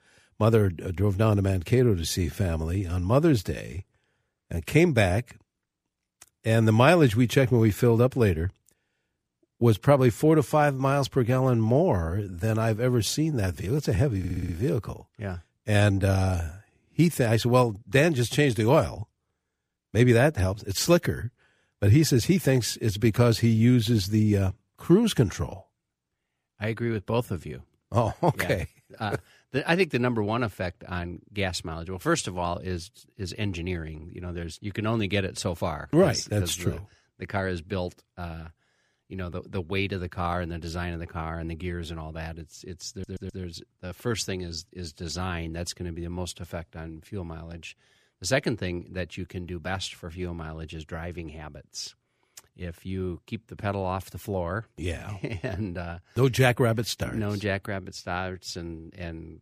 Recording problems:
audio stuttering; at 14 s and at 43 s

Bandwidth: 15 kHz